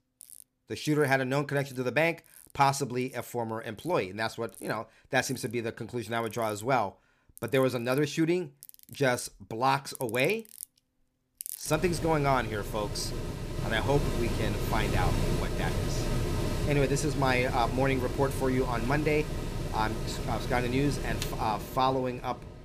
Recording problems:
machinery noise; loud; throughout; 5 dB below the speech

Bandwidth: 15 kHz